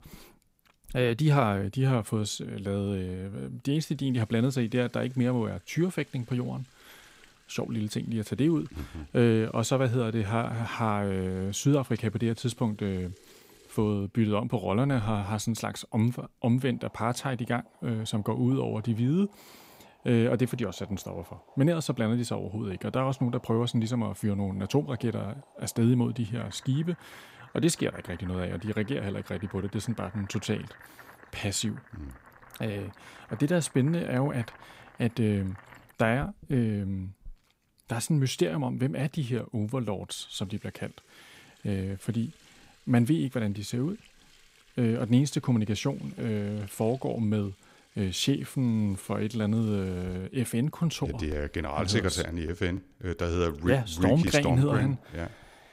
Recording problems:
household noises; faint; throughout; 25 dB below the speech

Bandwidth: 15.5 kHz